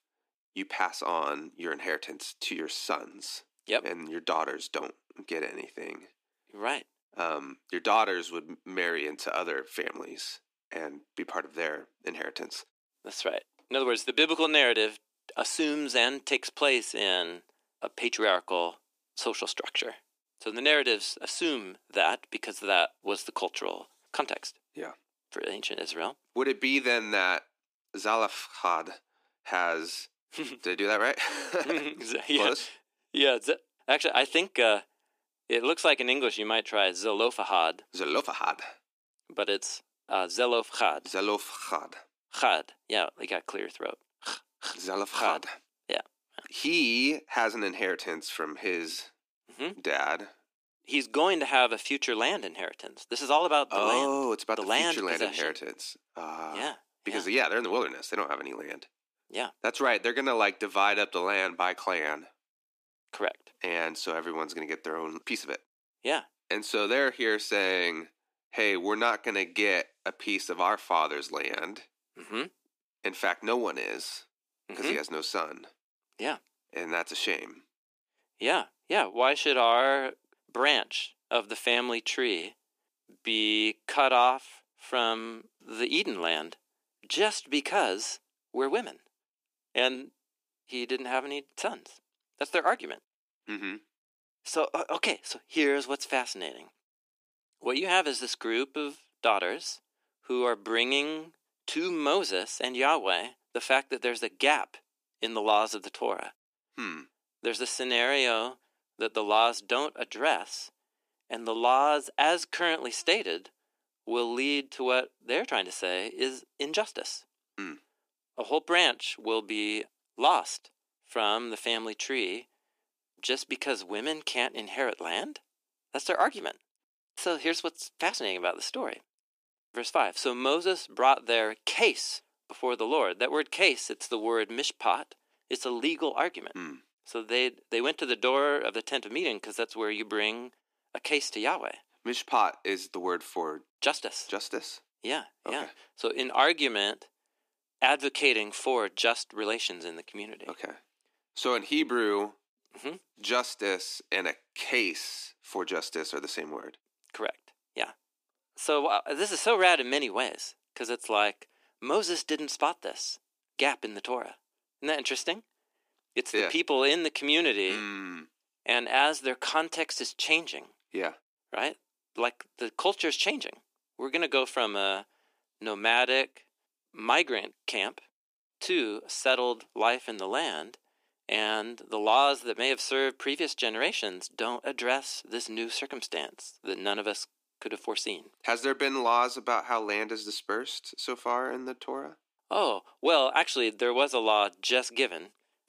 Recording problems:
thin; somewhat; fading below 300 Hz

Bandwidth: 15 kHz